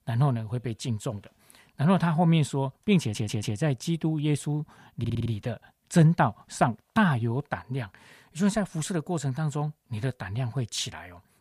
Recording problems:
audio stuttering; at 3 s and at 5 s

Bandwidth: 15 kHz